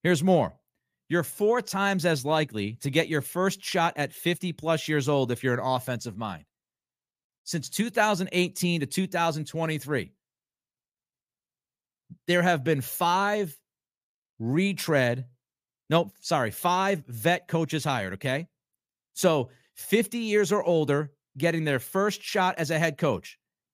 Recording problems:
none

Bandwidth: 15 kHz